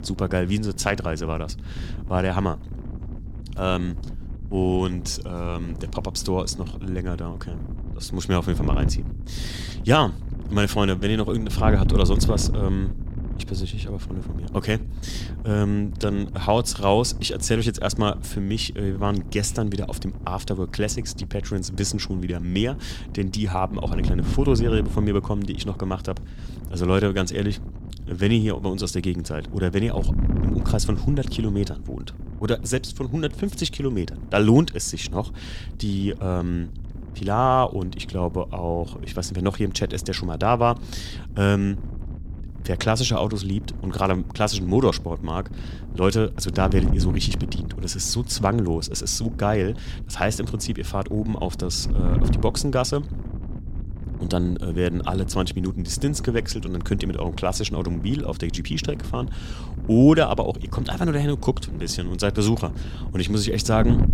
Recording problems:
wind noise on the microphone; occasional gusts; 15 dB below the speech

